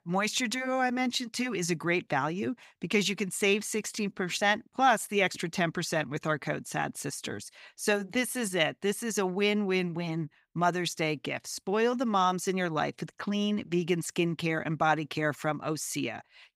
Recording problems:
none

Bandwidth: 15.5 kHz